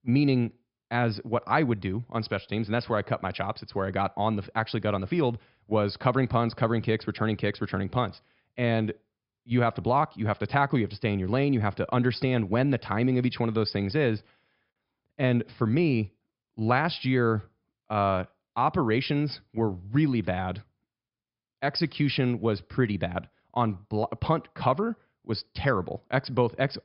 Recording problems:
high frequencies cut off; noticeable; nothing above 5.5 kHz

